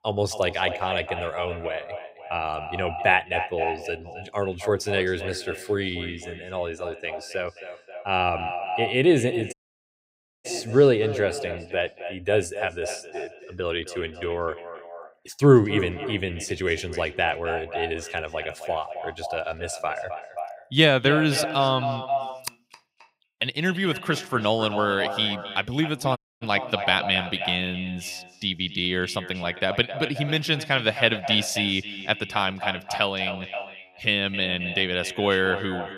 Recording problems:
echo of what is said; strong; throughout; 260 ms later, 9 dB below the speech
audio cutting out; at 9.5 s for 1 s and at 26 s

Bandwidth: 15.5 kHz